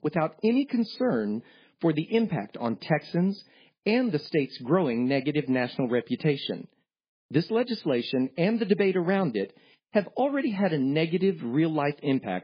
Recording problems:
garbled, watery; badly; nothing above 5 kHz

